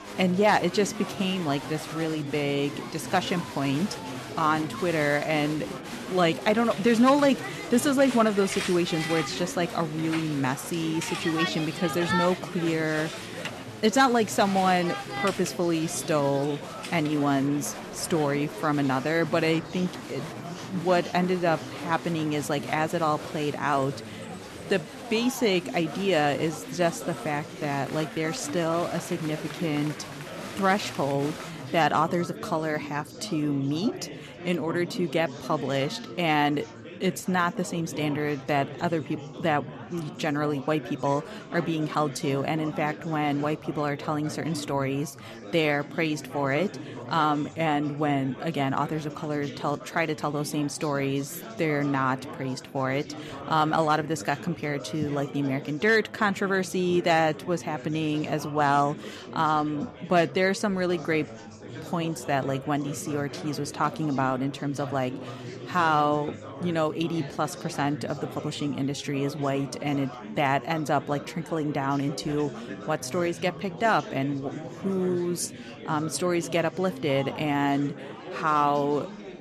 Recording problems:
chatter from many people; noticeable; throughout; 10 dB below the speech

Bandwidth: 13.5 kHz